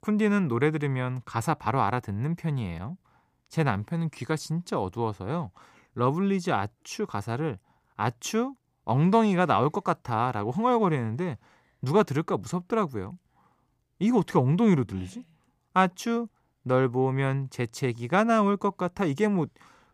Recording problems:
none

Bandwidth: 15 kHz